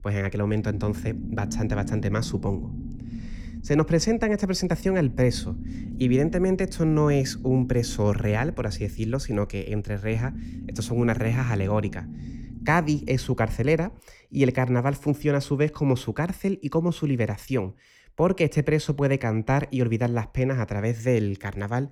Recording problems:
low rumble; noticeable; until 14 s; 15 dB below the speech

